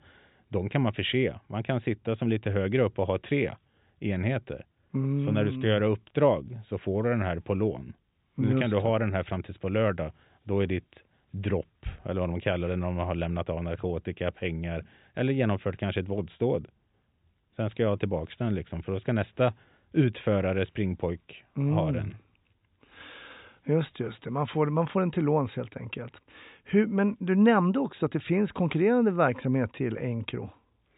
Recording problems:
high frequencies cut off; severe; nothing above 4 kHz

